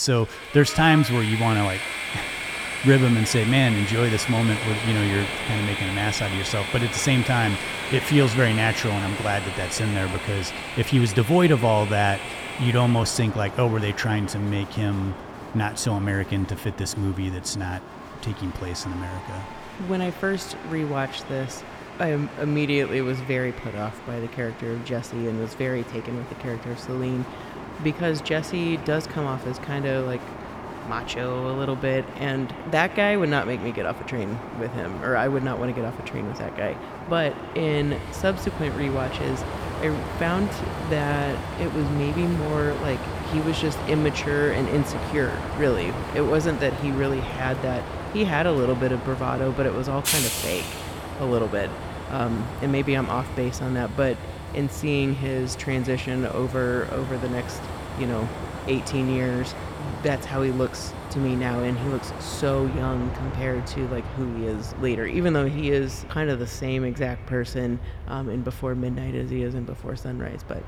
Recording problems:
echo of what is said; faint; throughout; 120 ms later, 20 dB below the speech
train or aircraft noise; loud; throughout; 7 dB below the speech
crowd noise; faint; throughout; 20 dB below the speech
abrupt cut into speech; at the start

